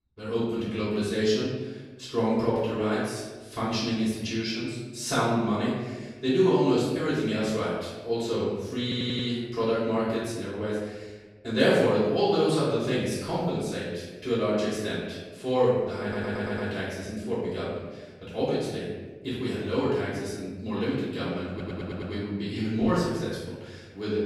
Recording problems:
room echo; strong; dies away in 1.2 s
off-mic speech; far
audio stuttering; at 9 s, at 16 s and at 22 s

